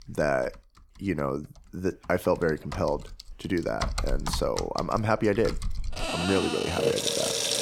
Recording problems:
household noises; loud; throughout; 2 dB below the speech

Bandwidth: 18 kHz